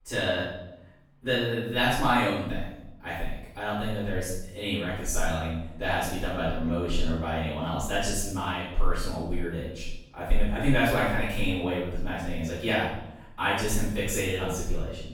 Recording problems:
room echo; strong; dies away in 0.7 s
off-mic speech; far

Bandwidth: 18 kHz